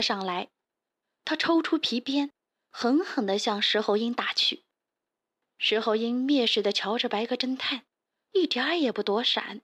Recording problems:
abrupt cut into speech; at the start

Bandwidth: 15 kHz